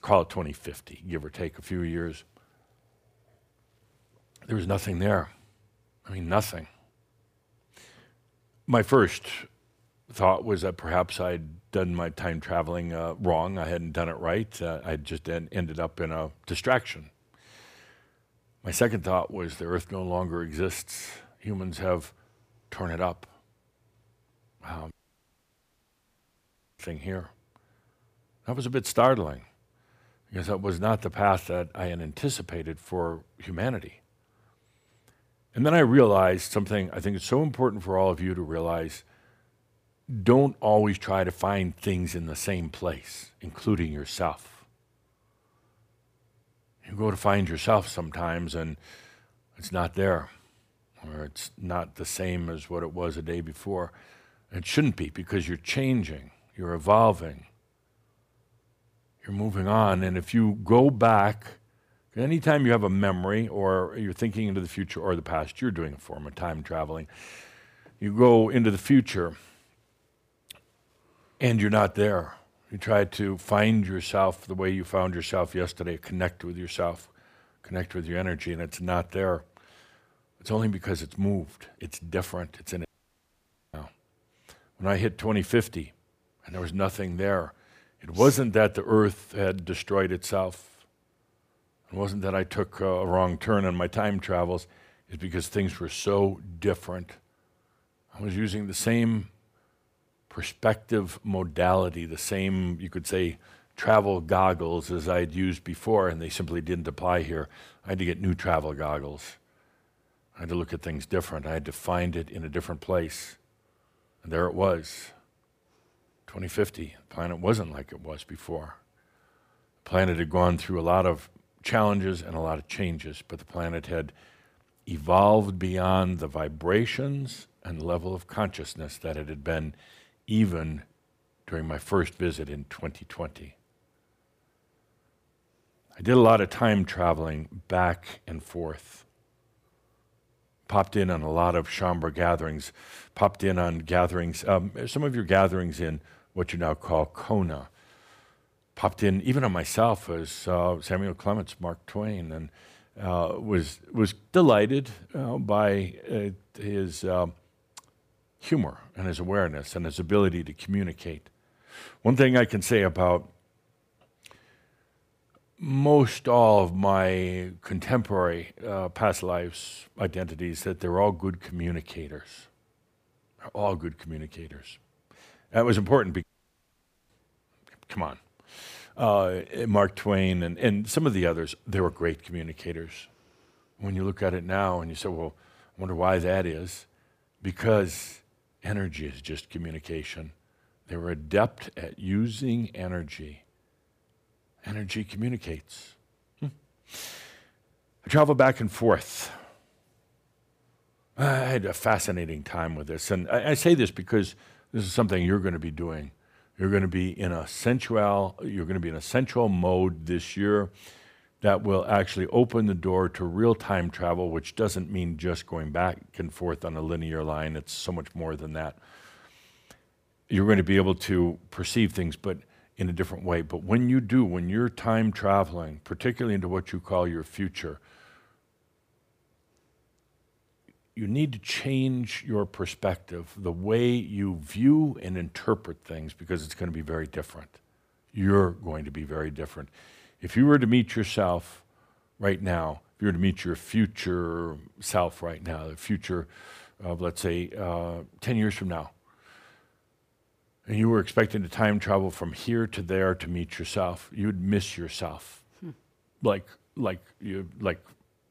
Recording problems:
audio cutting out; at 25 s for 2 s, at 1:23 for 1 s and at 2:56 for 1 s

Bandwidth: 15 kHz